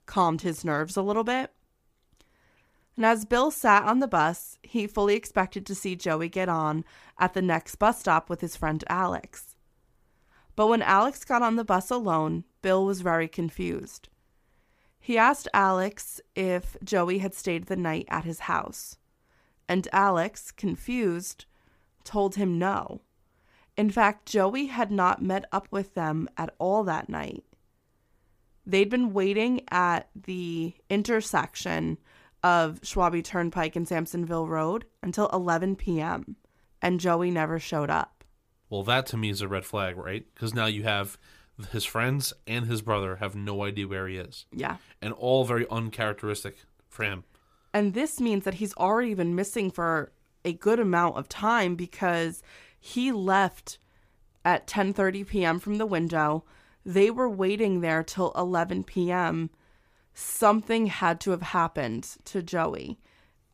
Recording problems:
none

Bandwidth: 15 kHz